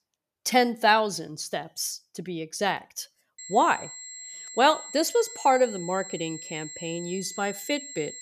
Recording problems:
high-pitched whine; noticeable; from 3.5 s on; 7.5 kHz, 10 dB below the speech

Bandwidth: 14.5 kHz